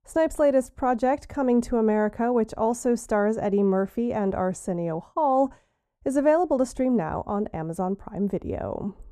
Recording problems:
muffled; very; fading above 1.5 kHz

